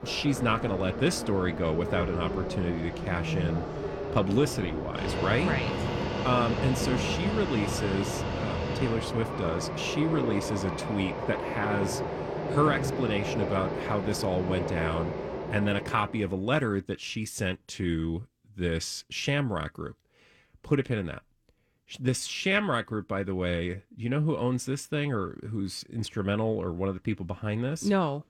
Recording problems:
train or aircraft noise; loud; until 16 s; 3 dB below the speech

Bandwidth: 17 kHz